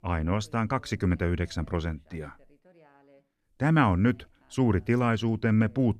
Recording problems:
none

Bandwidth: 14 kHz